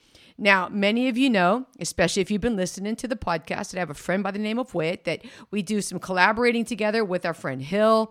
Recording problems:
none

